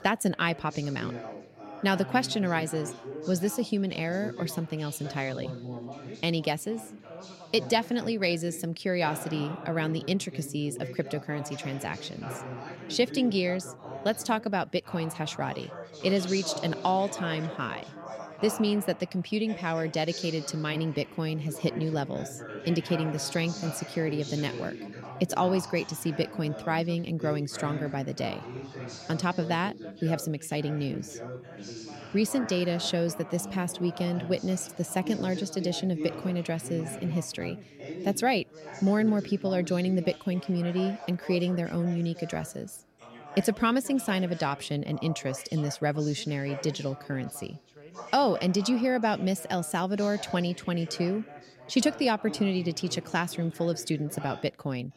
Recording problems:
background chatter; noticeable; throughout; 3 voices, 10 dB below the speech

